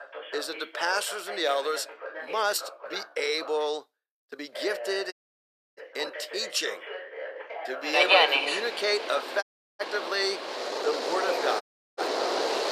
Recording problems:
thin; very; fading below 450 Hz
train or aircraft noise; very loud; from 8 s on; 4 dB above the speech
voice in the background; loud; throughout; 9 dB below the speech
uneven, jittery; strongly; from 2 to 11 s
audio cutting out; at 5 s for 0.5 s, at 9.5 s and at 12 s

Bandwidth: 14.5 kHz